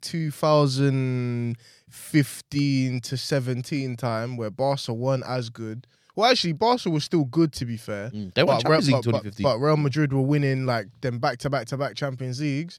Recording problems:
none

